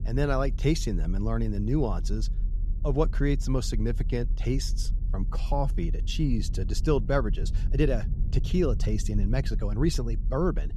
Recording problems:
low rumble; noticeable; throughout; 20 dB below the speech

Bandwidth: 13.5 kHz